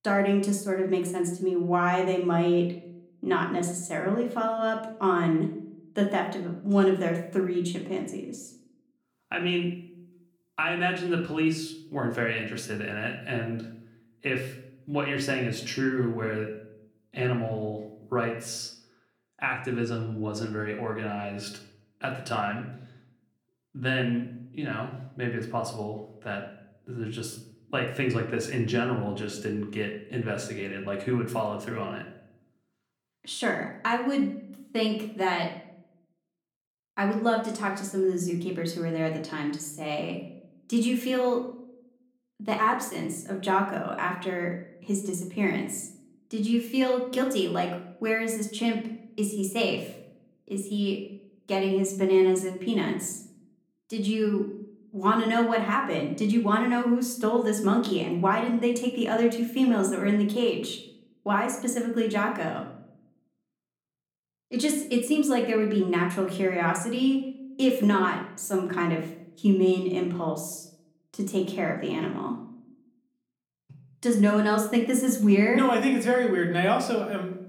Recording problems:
room echo; slight; dies away in 0.5 s
off-mic speech; somewhat distant

